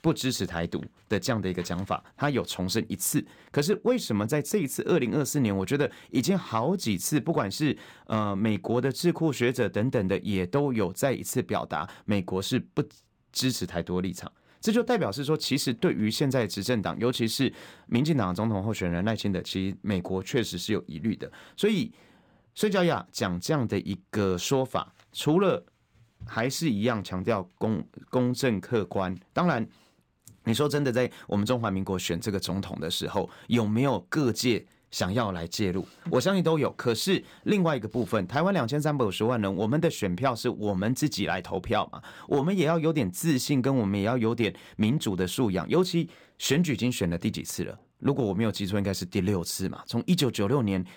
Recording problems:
none

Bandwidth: 18 kHz